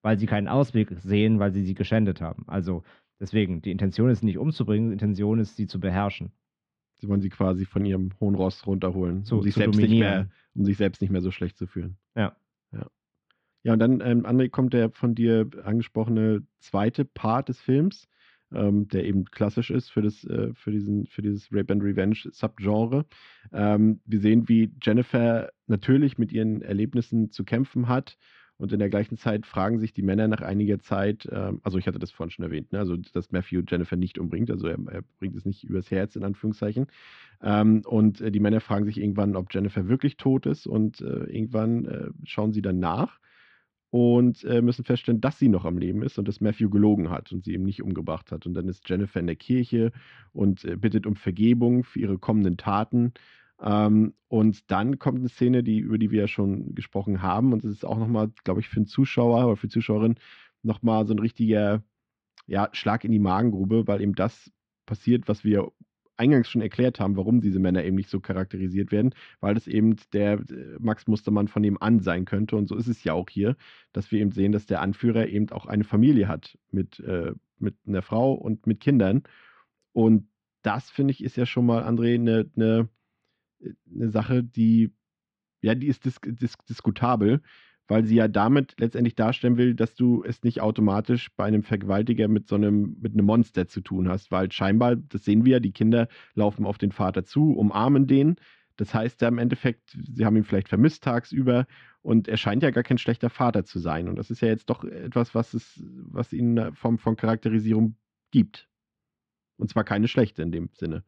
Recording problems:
muffled; very; fading above 2.5 kHz

